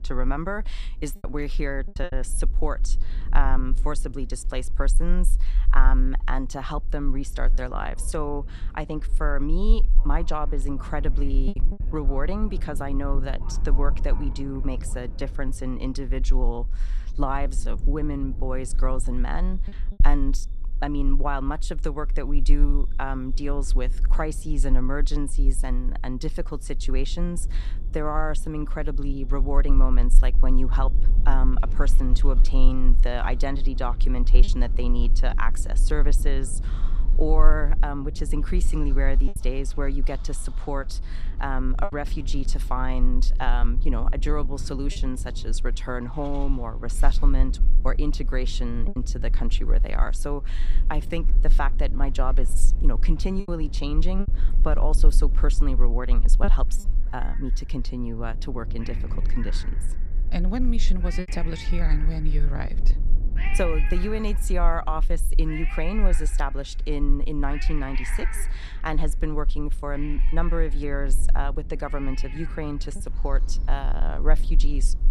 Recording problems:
animal sounds; noticeable; throughout; 15 dB below the speech
wind noise on the microphone; occasional gusts; 20 dB below the speech
low rumble; faint; throughout; 20 dB below the speech
choppy; occasionally; 1% of the speech affected

